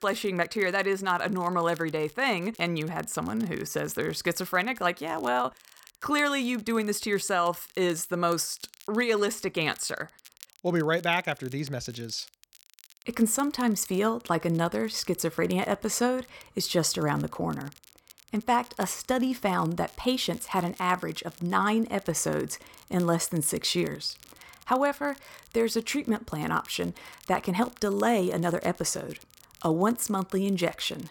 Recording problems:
crackle, like an old record; faint; 25 dB below the speech

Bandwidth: 17 kHz